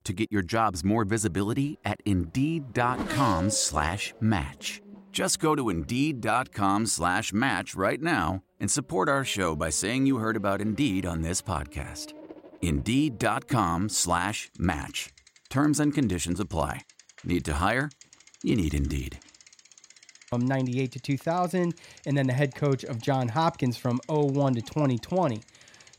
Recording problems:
traffic noise; noticeable; throughout; 20 dB below the speech

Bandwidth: 16 kHz